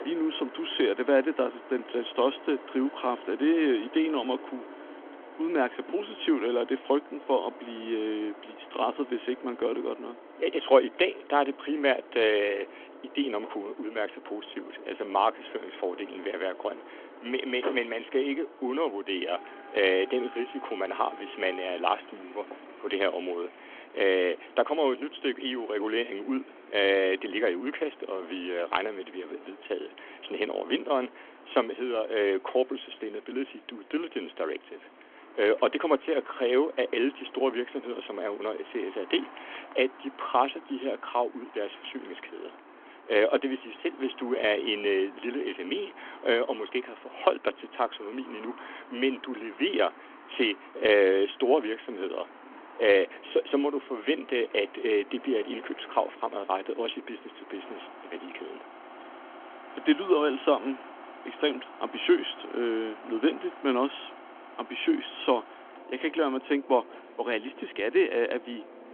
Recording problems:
phone-call audio; nothing above 3.5 kHz
traffic noise; noticeable; throughout; 20 dB below the speech

